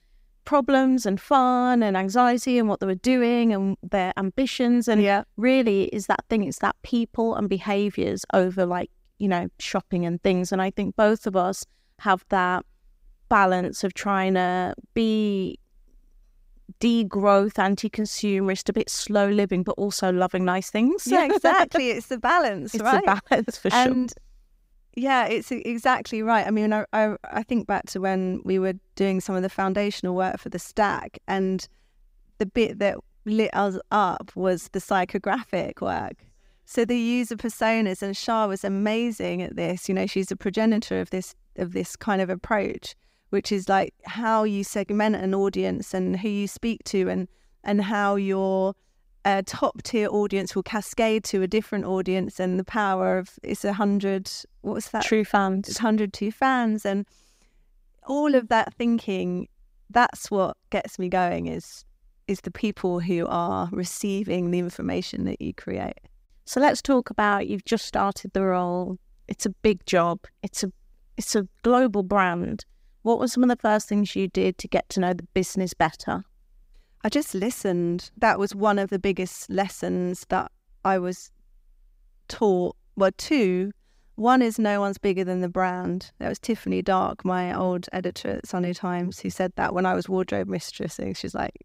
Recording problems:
none

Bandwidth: 15.5 kHz